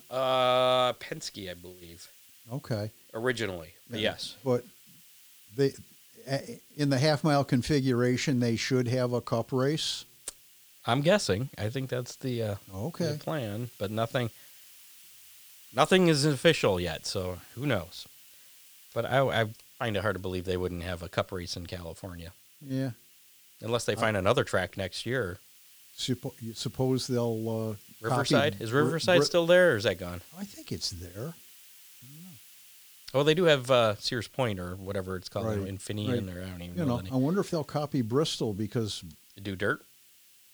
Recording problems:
hiss; faint; throughout; 20 dB below the speech

